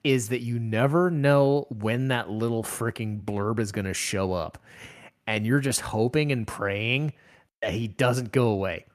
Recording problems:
none

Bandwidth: 14.5 kHz